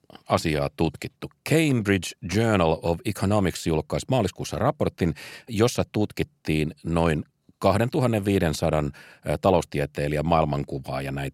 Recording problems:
none

